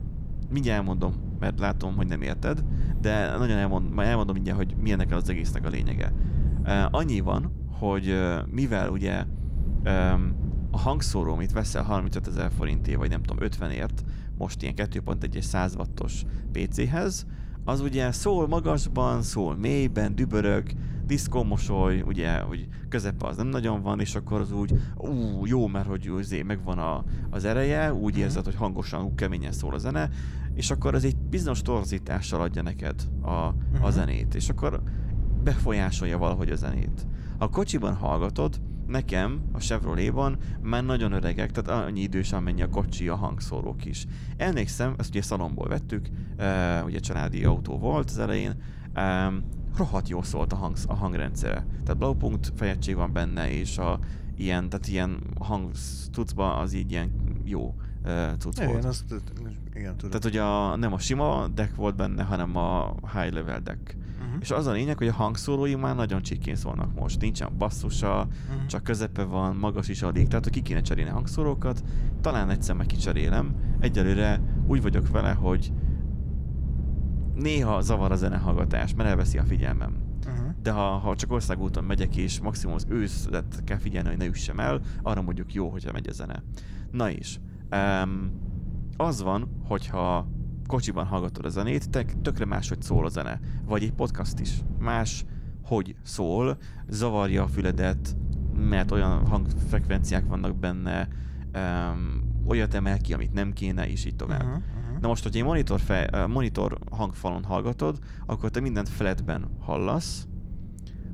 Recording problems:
low rumble; noticeable; throughout; 15 dB below the speech

